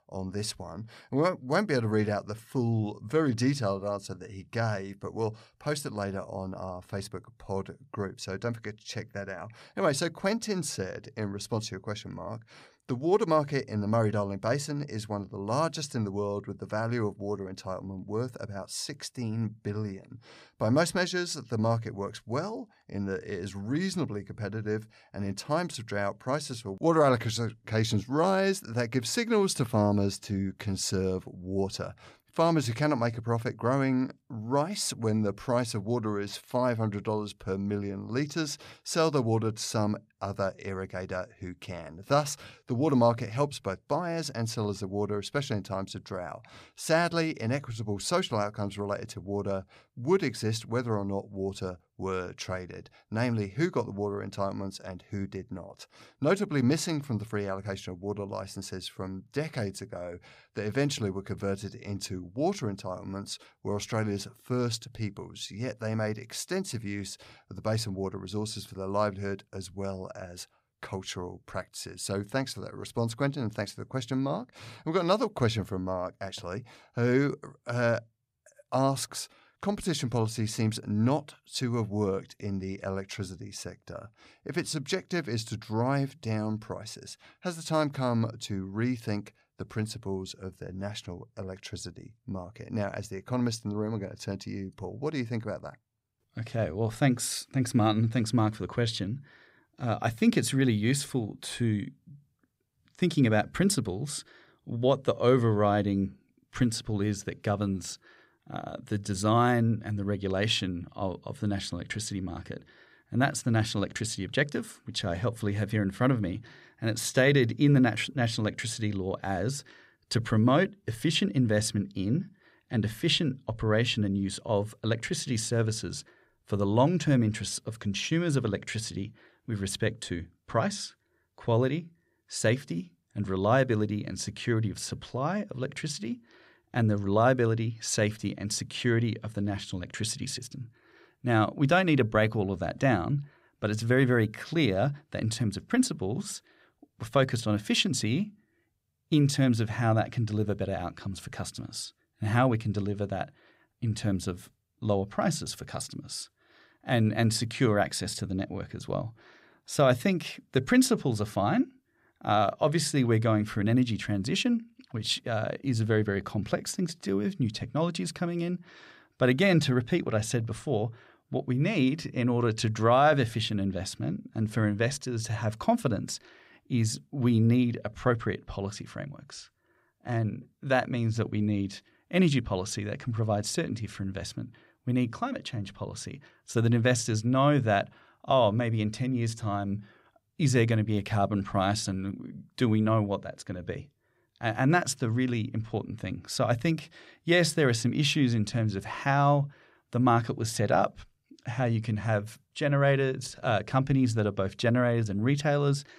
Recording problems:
none

